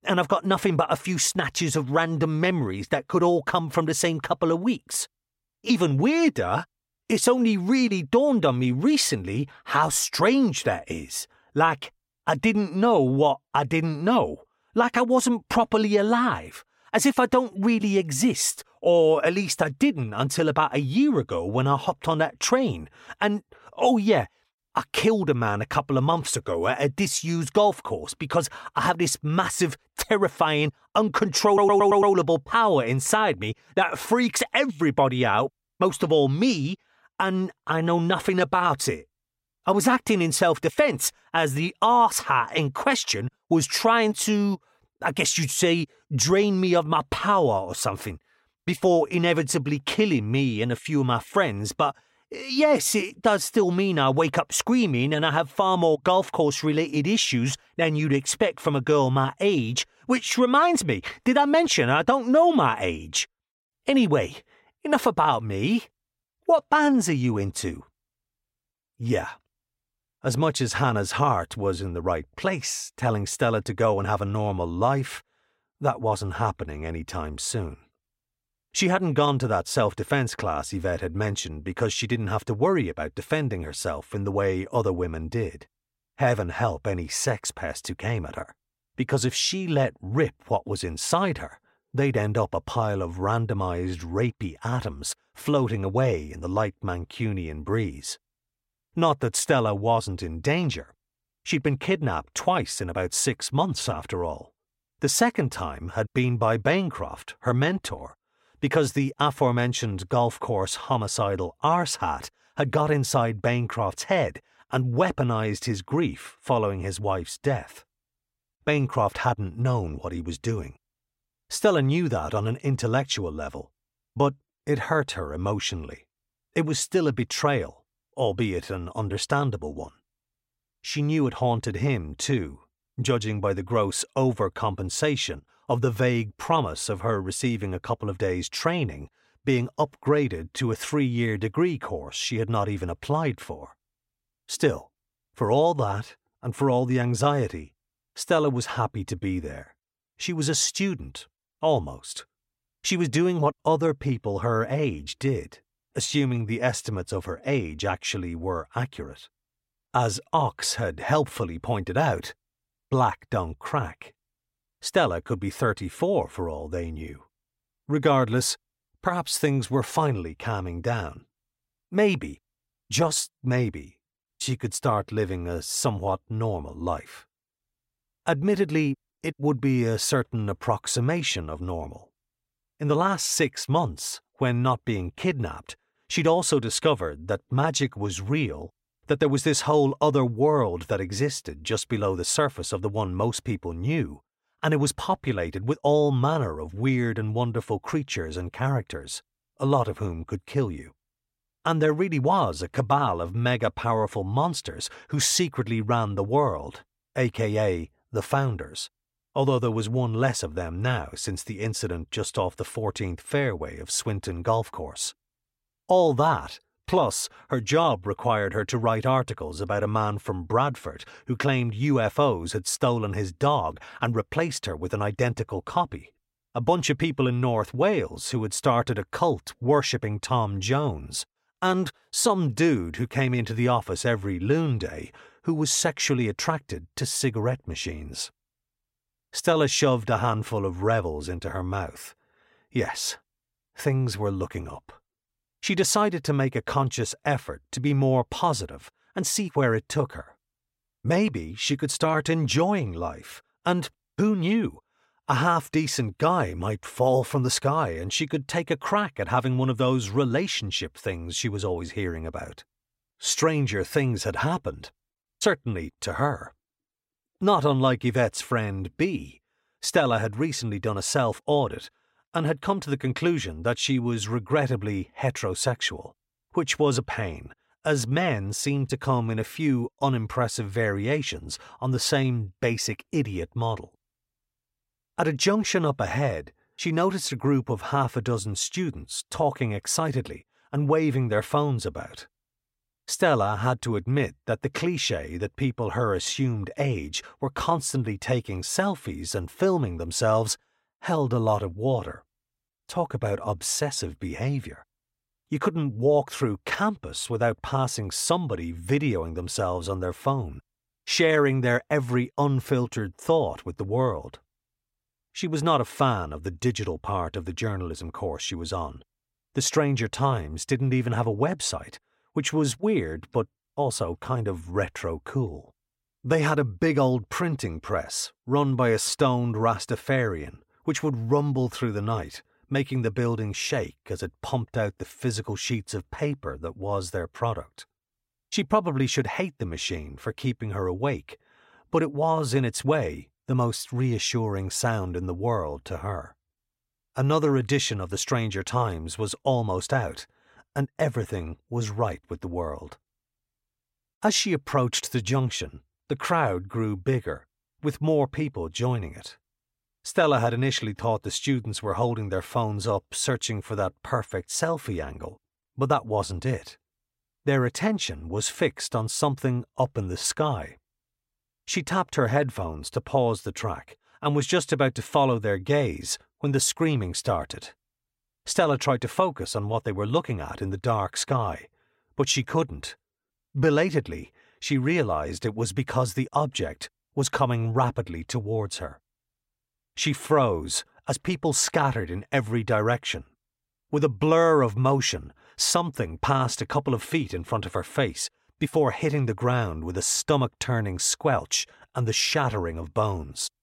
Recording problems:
audio stuttering; at 31 s

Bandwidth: 16 kHz